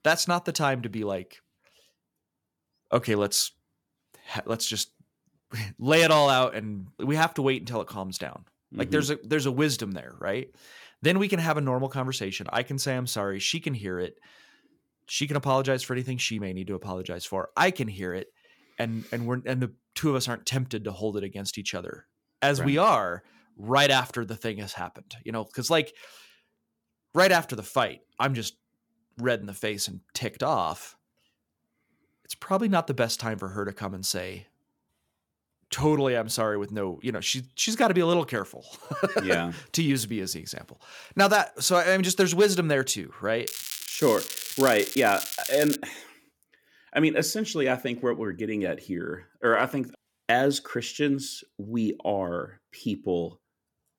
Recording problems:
crackling; loud; from 43 to 46 s; 6 dB below the speech

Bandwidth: 18.5 kHz